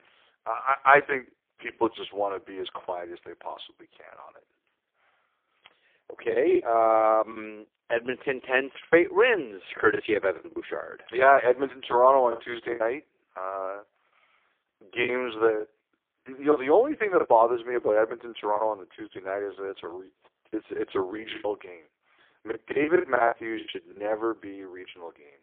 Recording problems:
phone-call audio; poor line; nothing above 3.5 kHz
choppy; very; 7% of the speech affected

